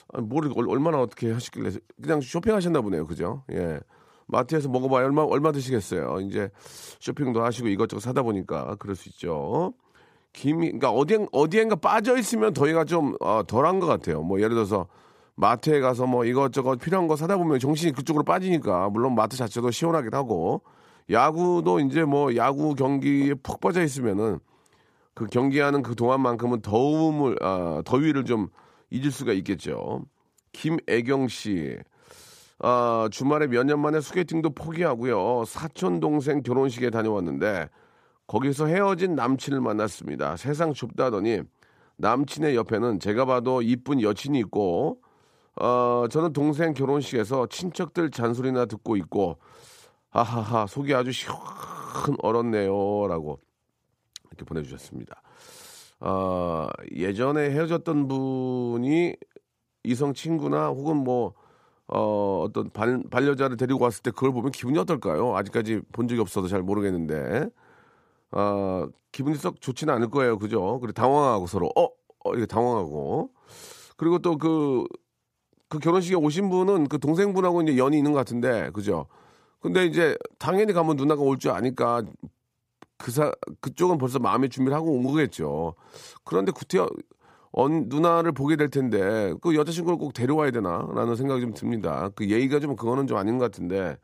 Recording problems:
none

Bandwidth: 15 kHz